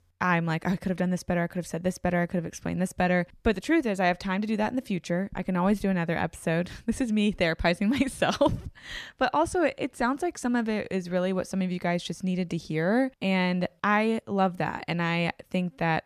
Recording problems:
none

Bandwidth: 14.5 kHz